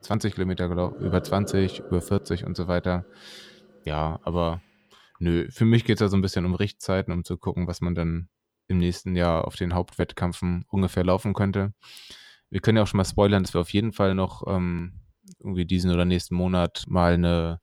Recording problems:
household noises; noticeable; until 4.5 s; 15 dB below the speech

